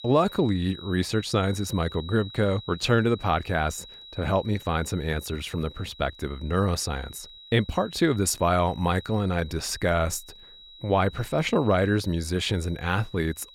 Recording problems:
high-pitched whine; noticeable; throughout; 4 kHz, 20 dB below the speech

